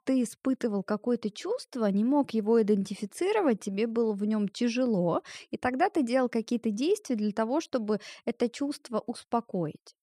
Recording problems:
none

